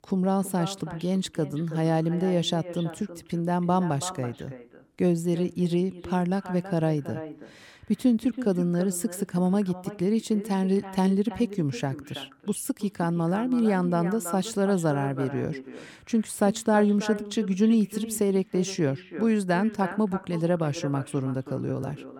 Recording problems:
echo of what is said; noticeable; throughout; 330 ms later, 15 dB below the speech

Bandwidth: 17 kHz